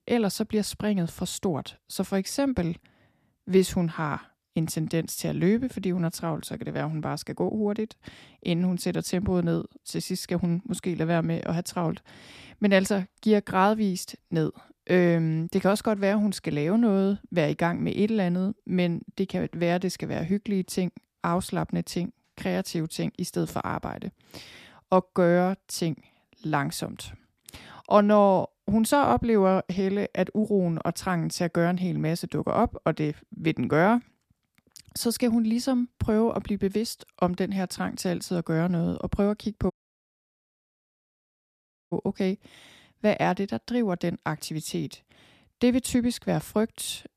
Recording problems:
audio cutting out; at 40 s for 2 s

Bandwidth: 14.5 kHz